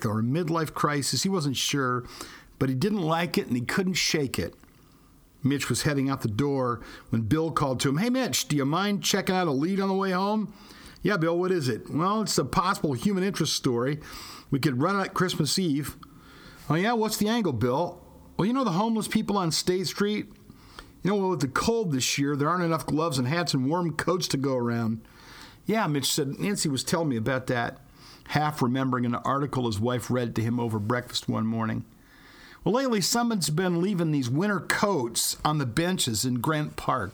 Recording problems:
squashed, flat; heavily

